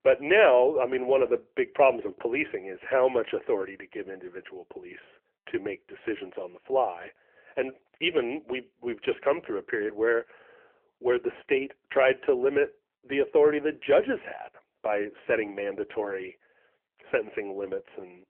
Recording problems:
phone-call audio; poor line; nothing above 3 kHz

